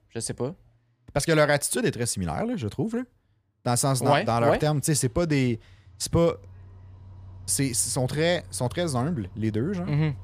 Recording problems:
traffic noise; faint; throughout; 20 dB below the speech

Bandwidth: 15 kHz